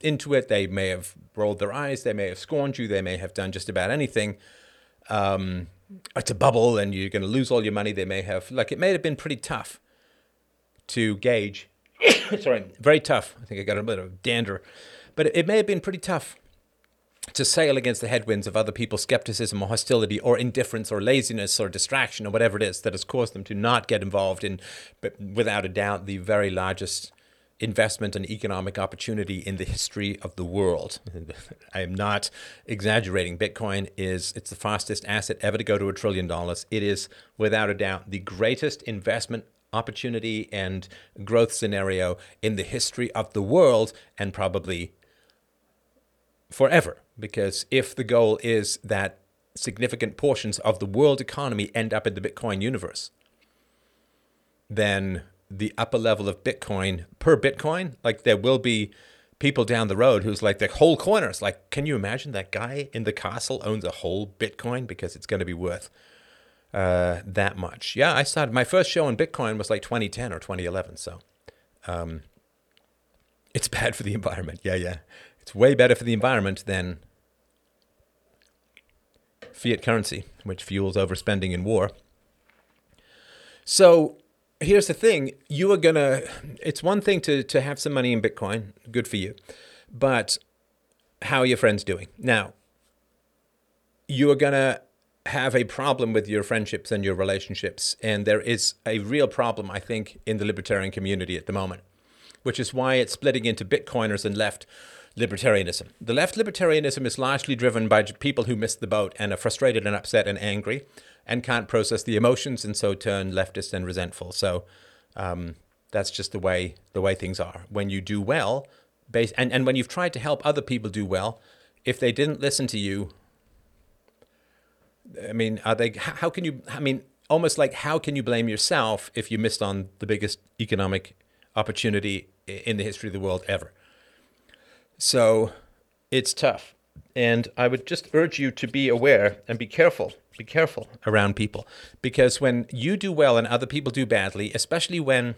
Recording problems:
none

